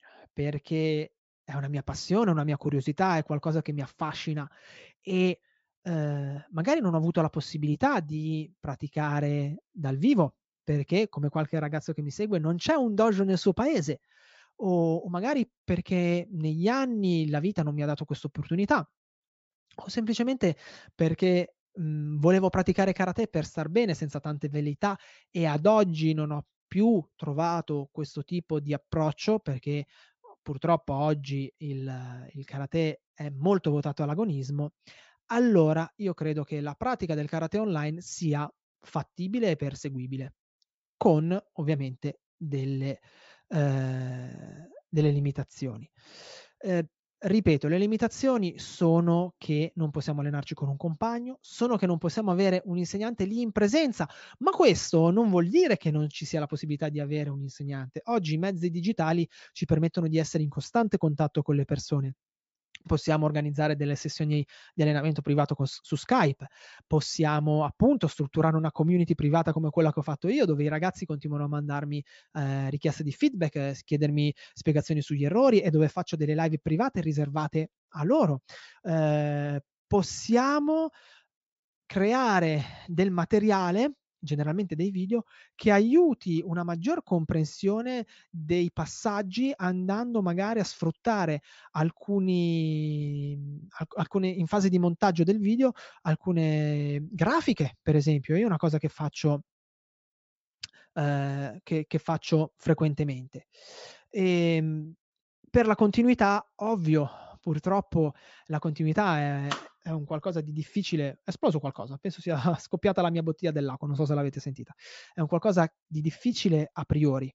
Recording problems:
high frequencies cut off; noticeable; nothing above 8 kHz

